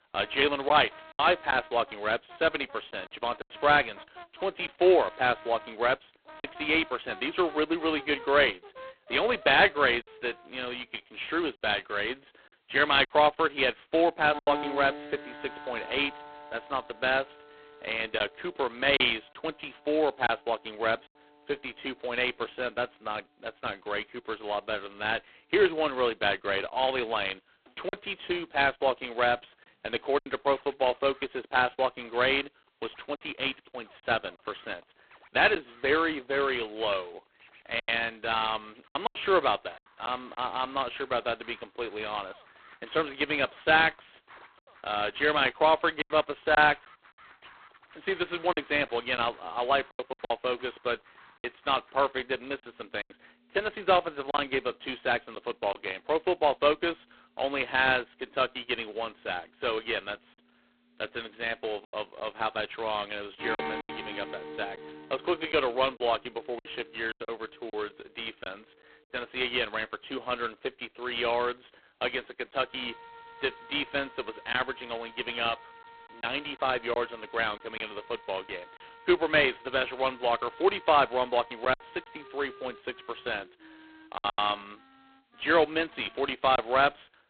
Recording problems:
phone-call audio; poor line; nothing above 4 kHz
background music; noticeable; throughout; 20 dB below the speech
choppy; occasionally; 4% of the speech affected

